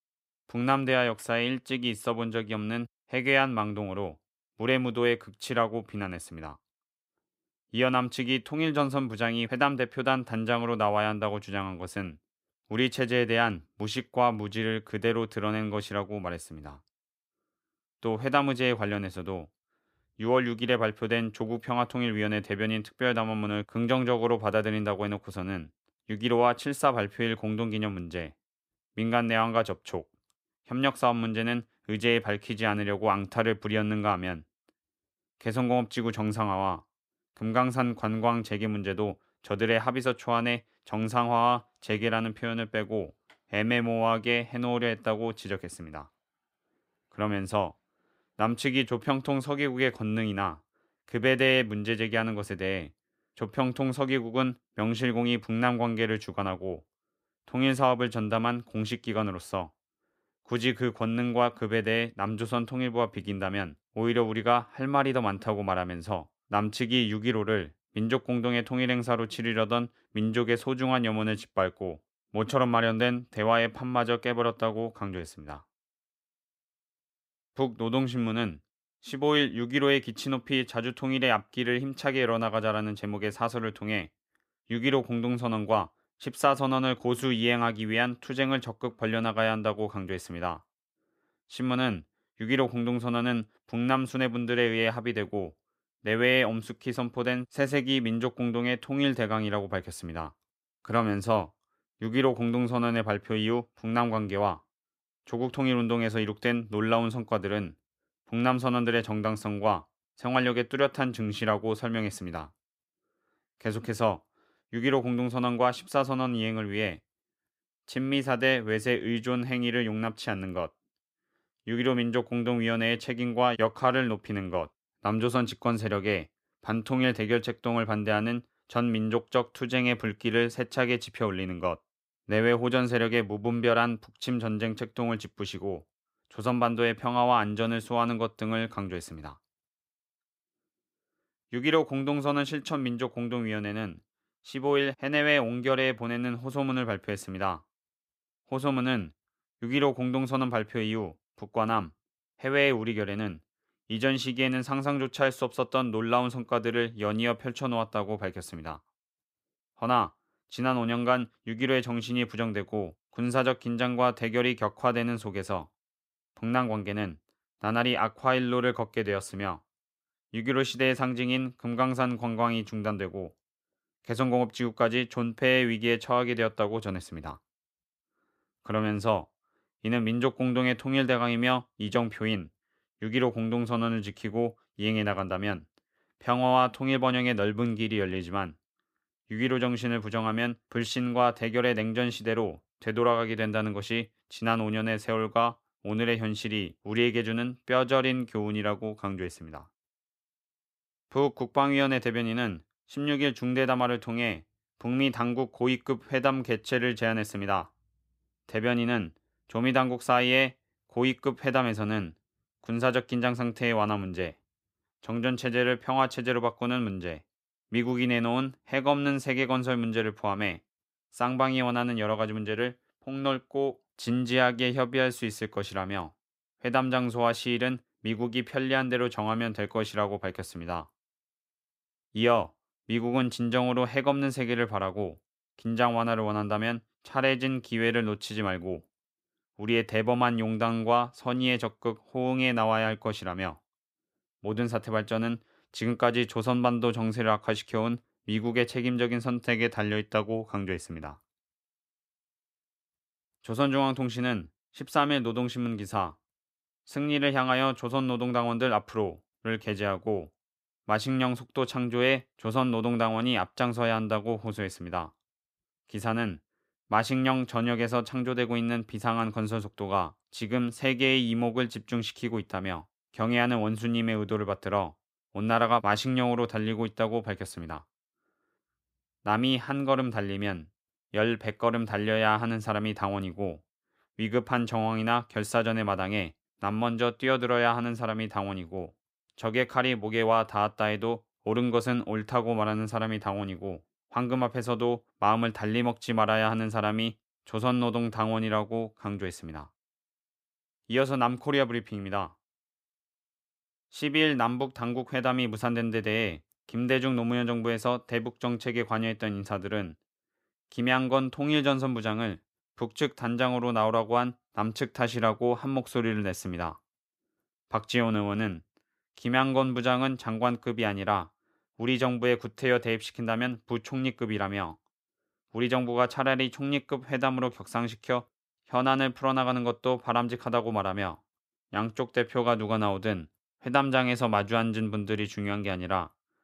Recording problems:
none

